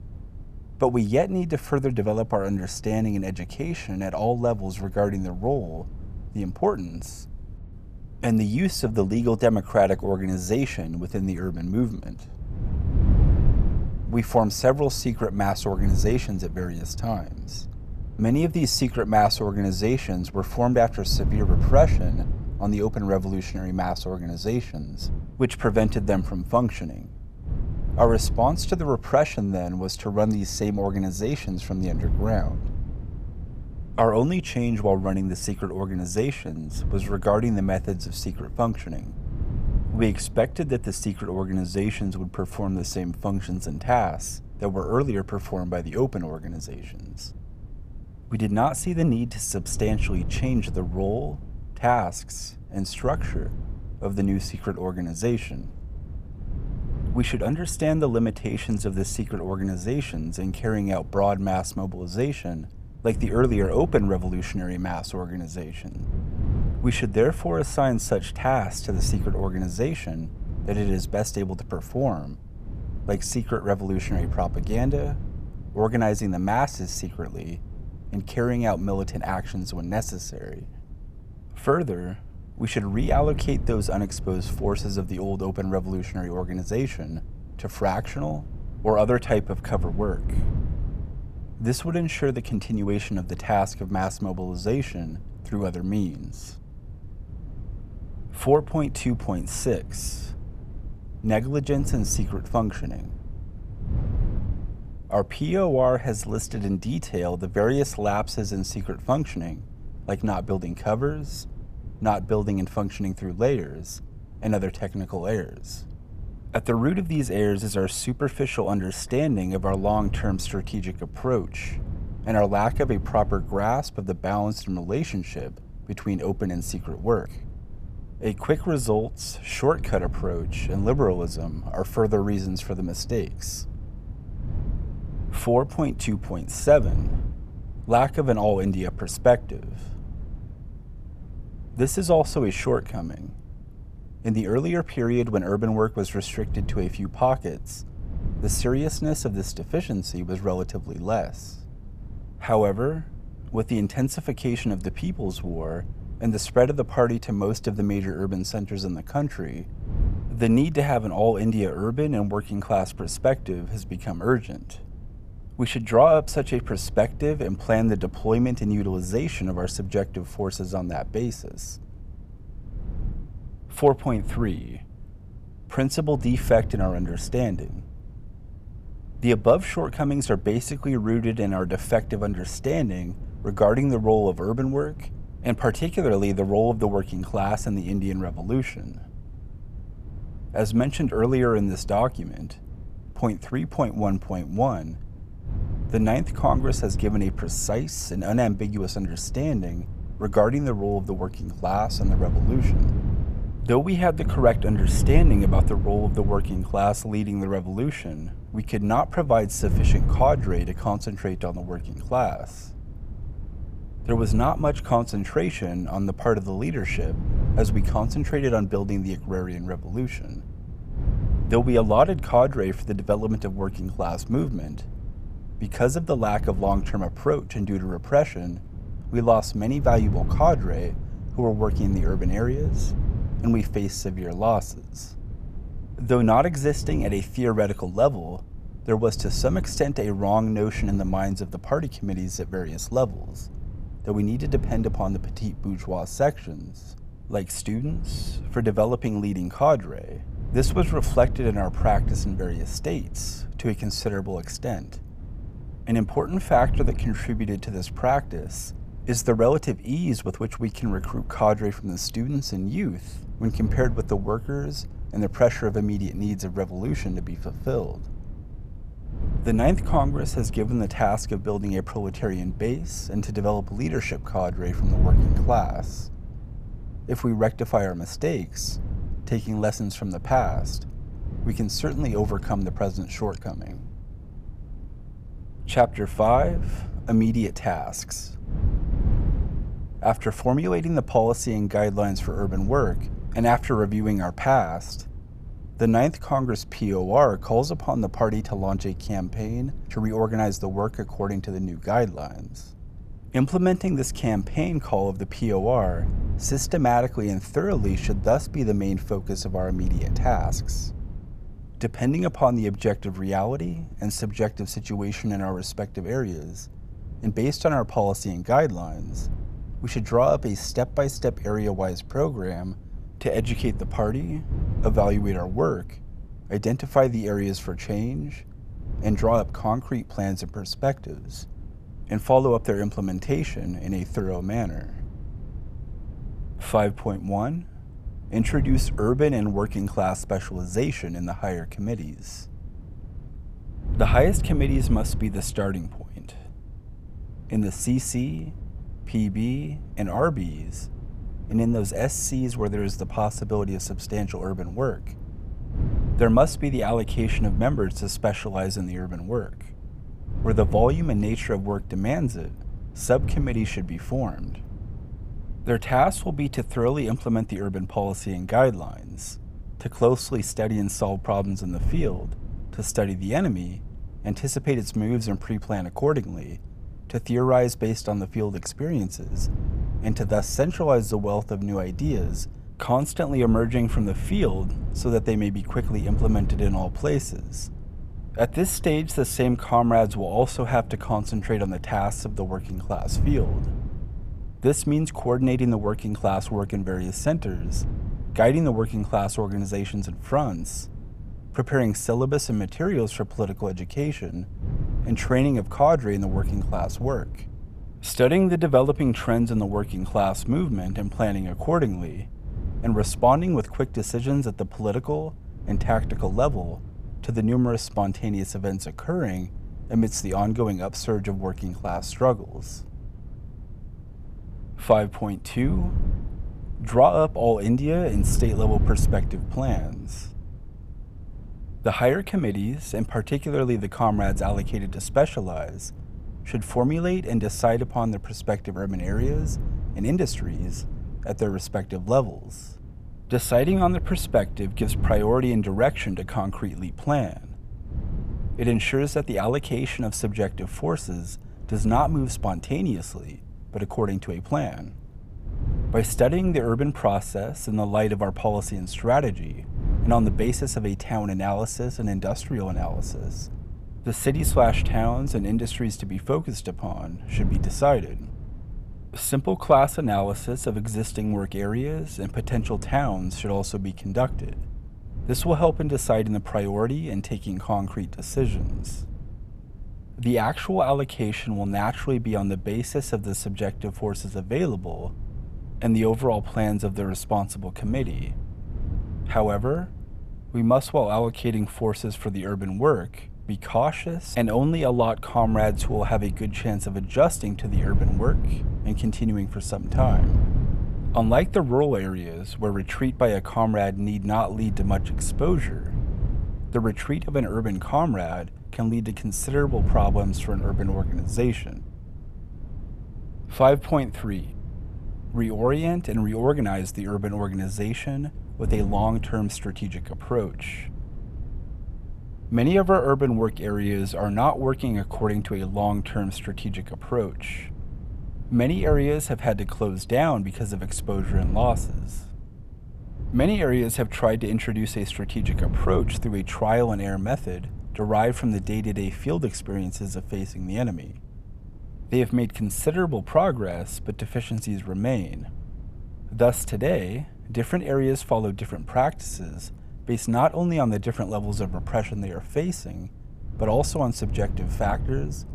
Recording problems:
wind noise on the microphone; occasional gusts; 20 dB below the speech

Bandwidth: 14.5 kHz